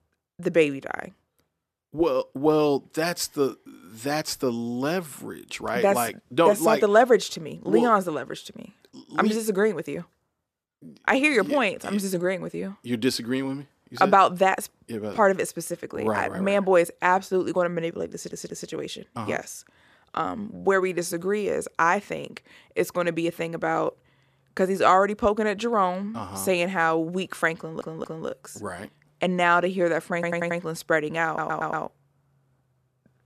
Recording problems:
audio stuttering; 4 times, first at 18 s

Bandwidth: 14.5 kHz